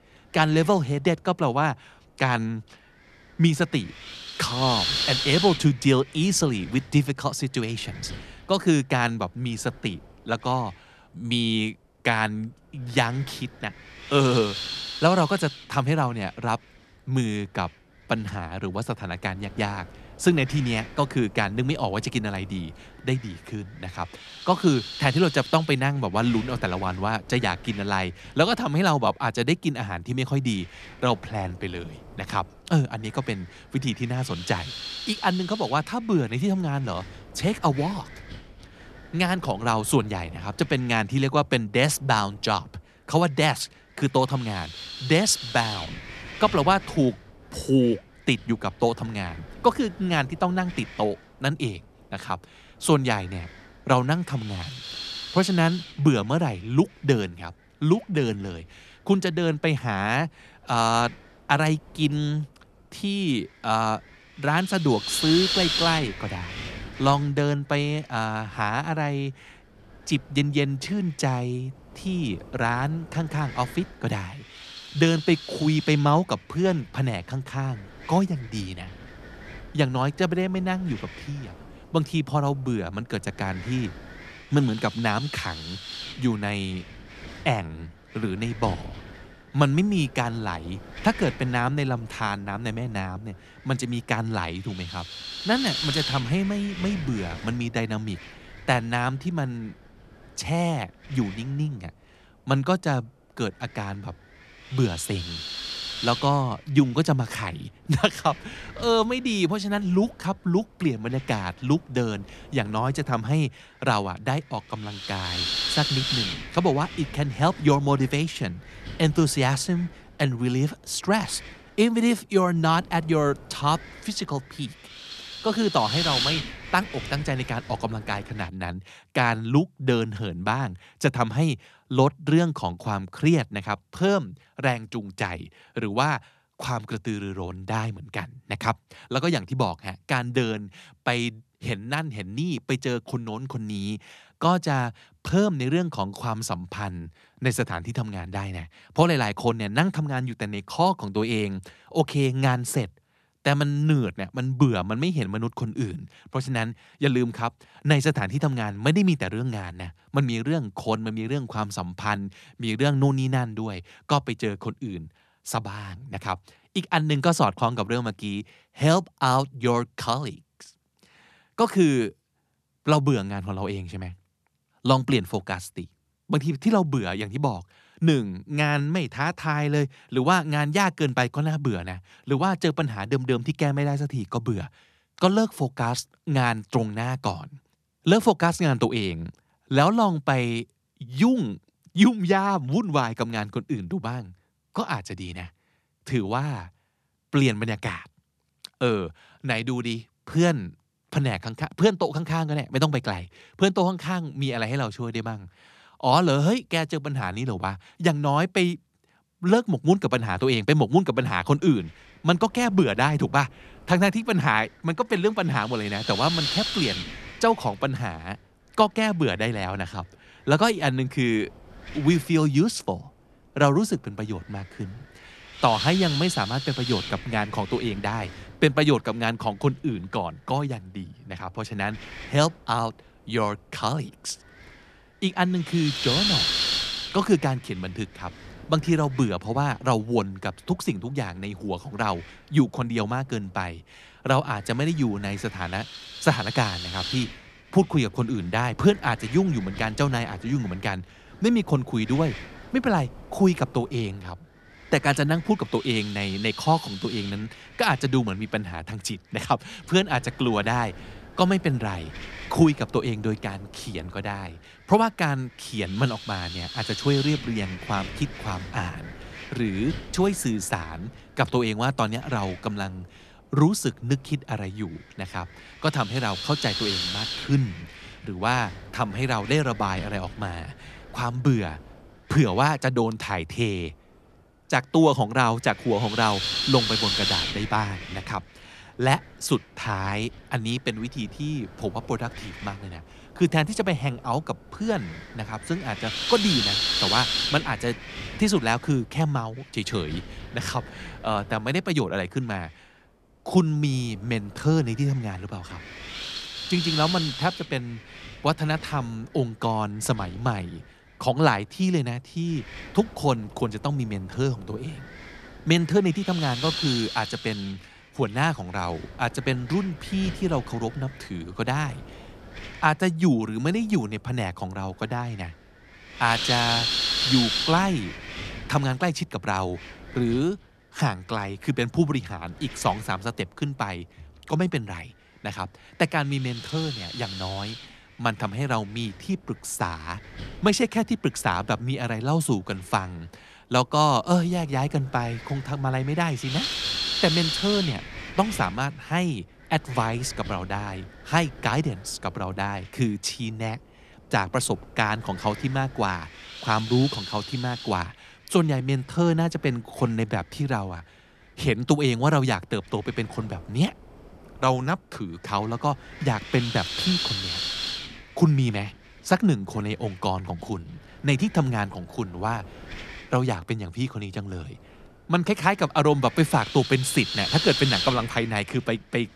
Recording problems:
wind noise on the microphone; heavy; until 2:08 and from 3:31 on; 4 dB below the speech

